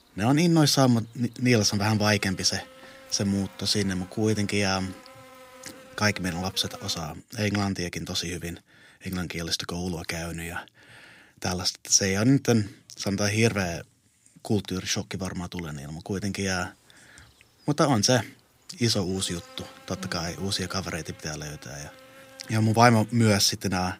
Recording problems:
electrical hum; faint; until 7 s and from 16 s on; 50 Hz, 20 dB below the speech

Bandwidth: 15.5 kHz